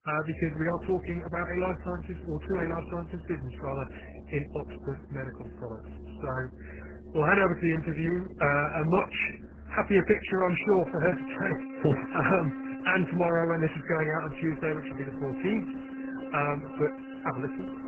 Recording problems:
garbled, watery; badly; nothing above 2.5 kHz
background music; noticeable; throughout; 10 dB below the speech

